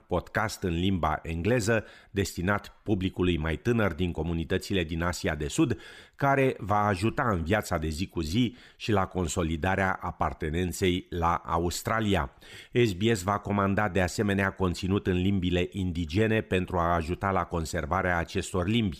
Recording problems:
none

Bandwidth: 15 kHz